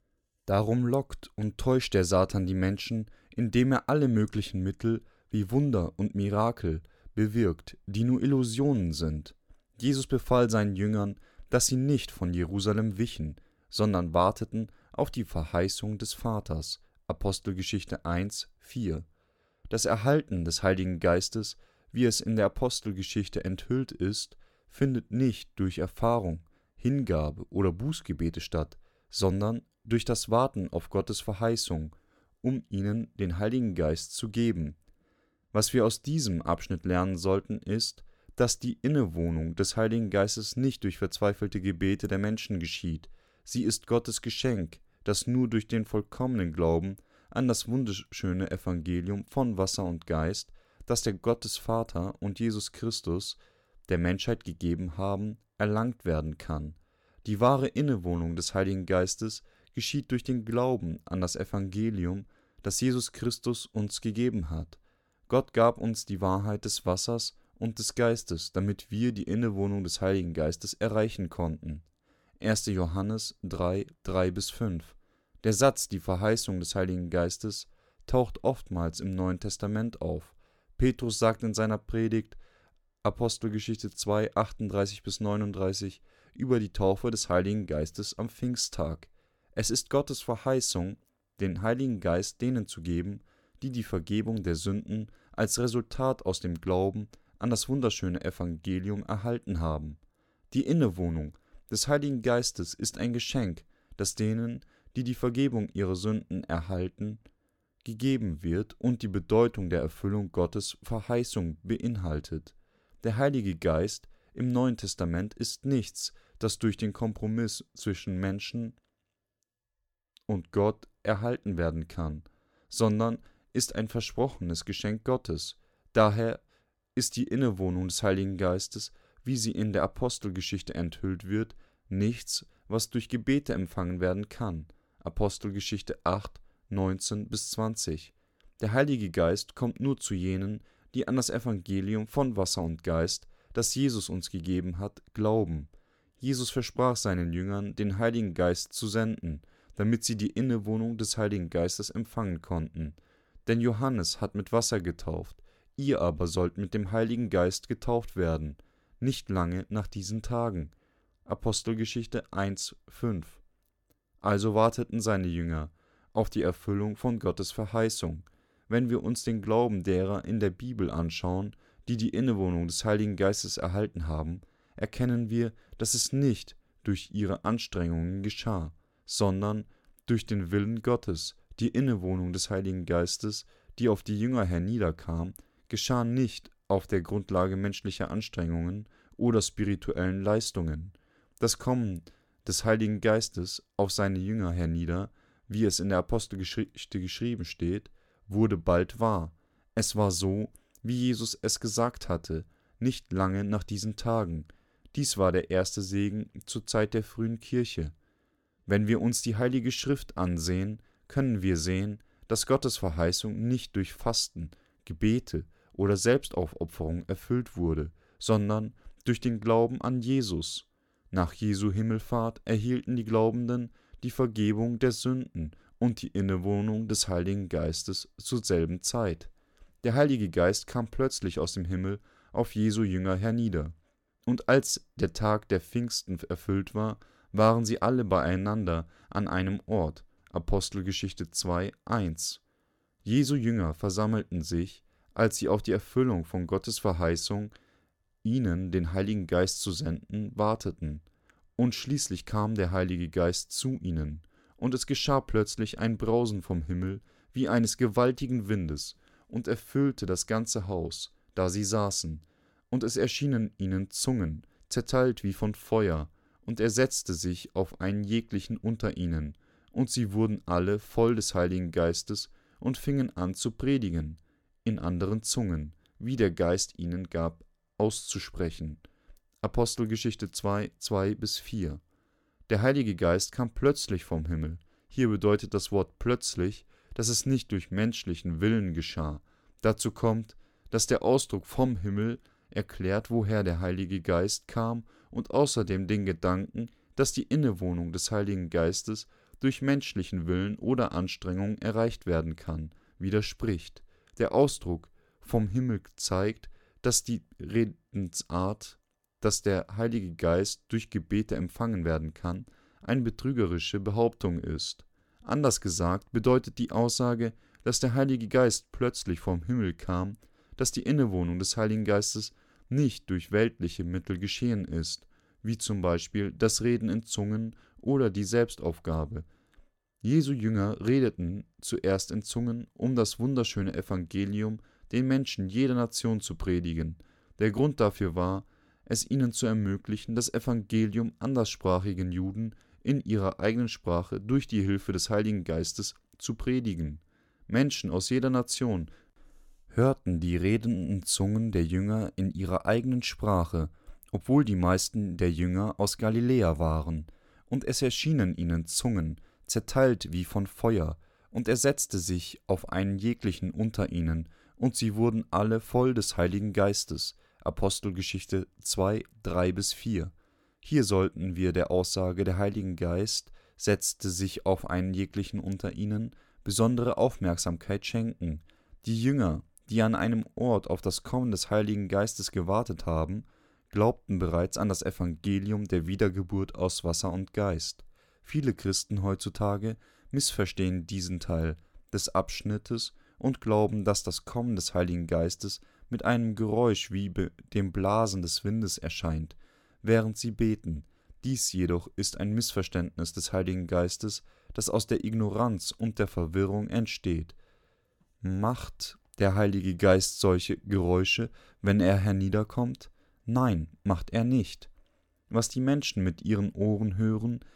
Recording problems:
none

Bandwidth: 17 kHz